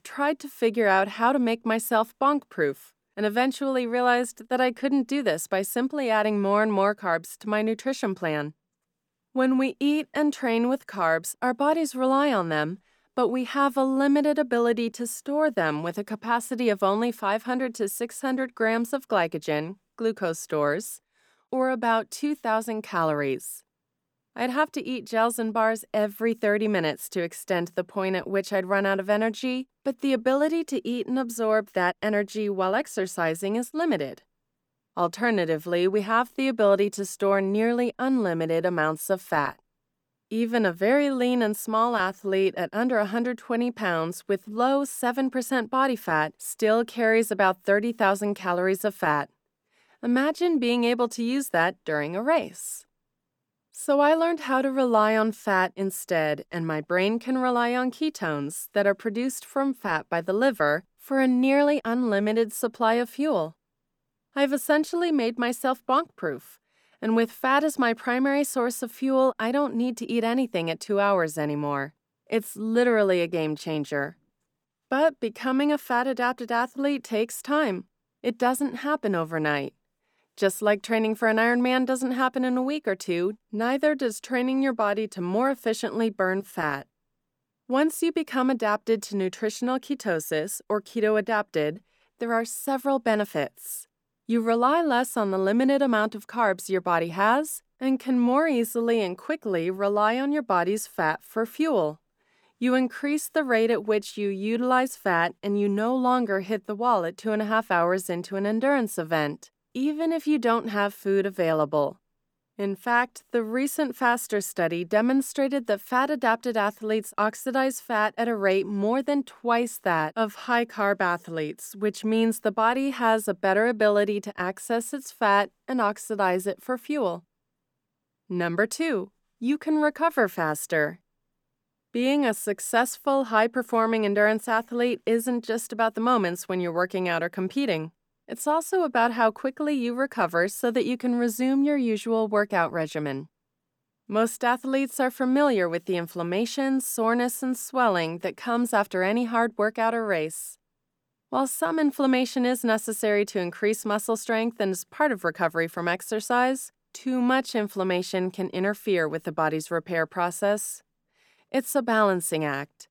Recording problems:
none

